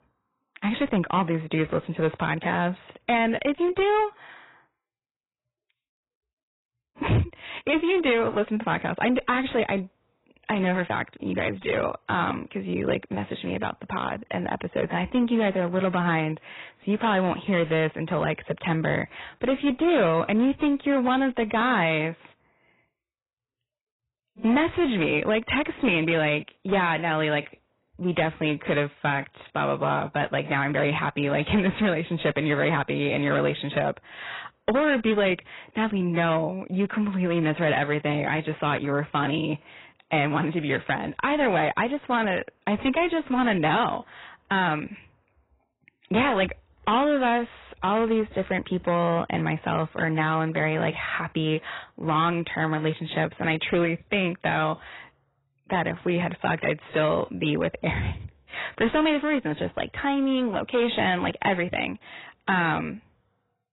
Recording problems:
garbled, watery; badly; nothing above 4 kHz
distortion; slight; 8% of the sound clipped

